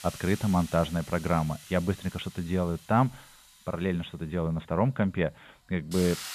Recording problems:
high frequencies cut off; severe; nothing above 4 kHz
hiss; noticeable; throughout; 15 dB below the speech

